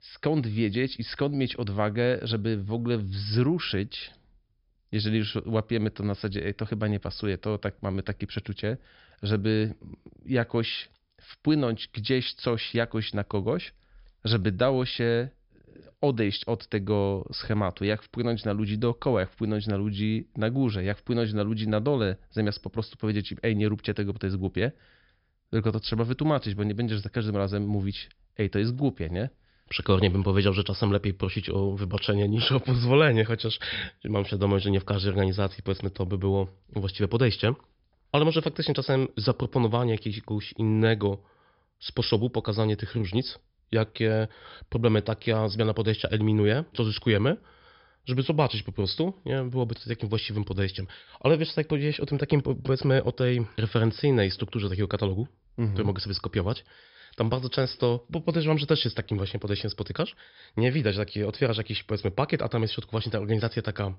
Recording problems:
high frequencies cut off; noticeable; nothing above 5.5 kHz

